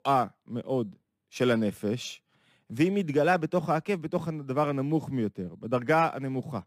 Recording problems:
none

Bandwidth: 15.5 kHz